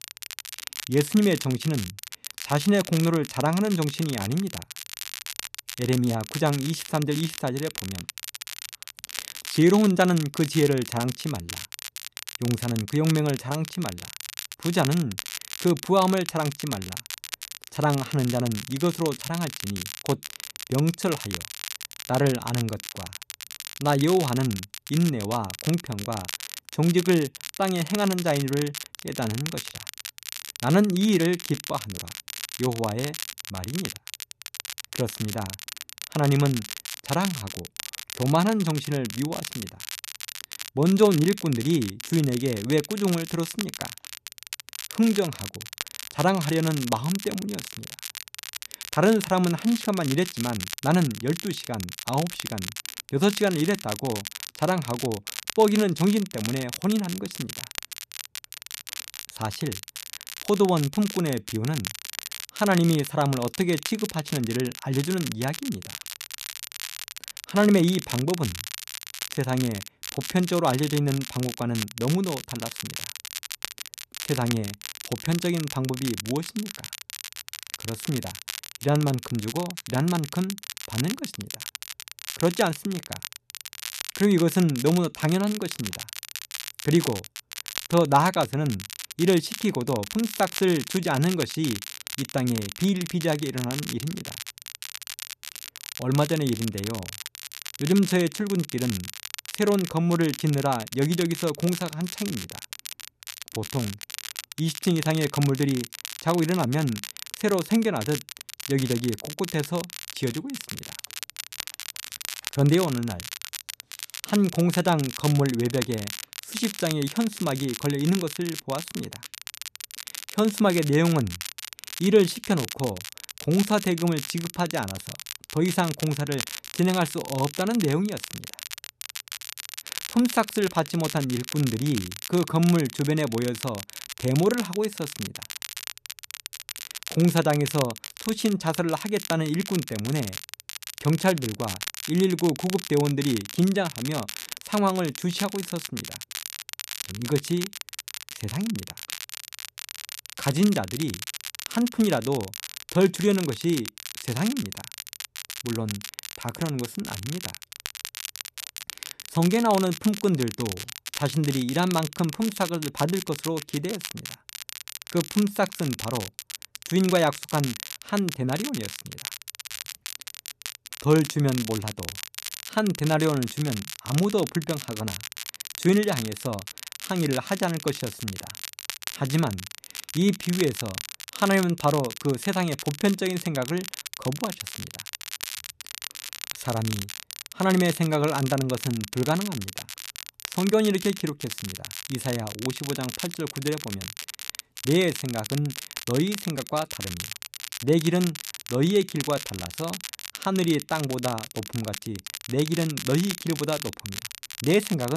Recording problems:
crackle, like an old record; loud; 9 dB below the speech
abrupt cut into speech; at the end

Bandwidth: 14 kHz